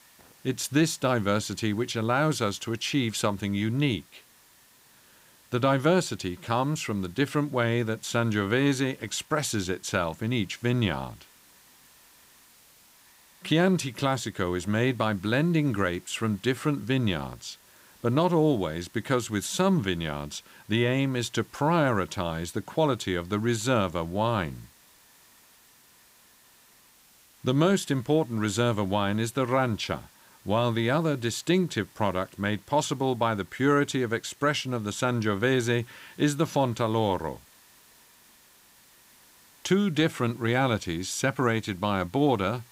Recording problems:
hiss; faint; throughout; 25 dB below the speech

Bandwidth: 15.5 kHz